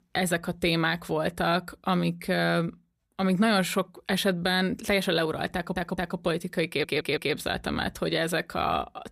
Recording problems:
audio stuttering; at 5.5 s and at 6.5 s

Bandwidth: 15 kHz